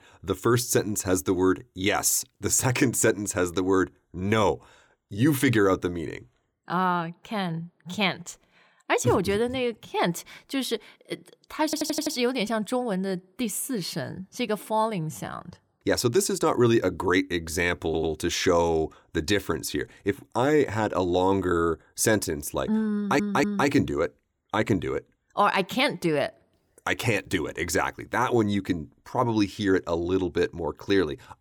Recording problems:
audio stuttering; at 12 s, at 18 s and at 23 s

